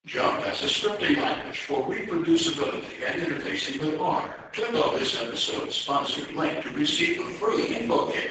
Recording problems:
off-mic speech; far
garbled, watery; badly; nothing above 7.5 kHz
thin; very; fading below 650 Hz
room echo; noticeable; dies away in 0.7 s

